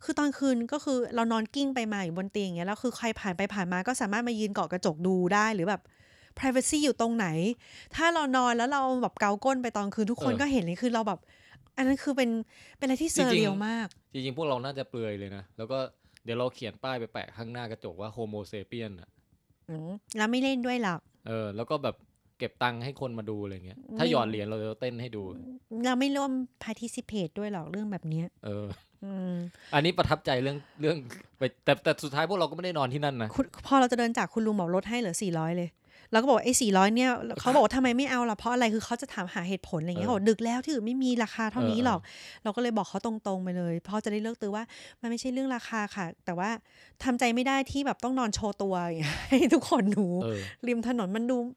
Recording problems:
none

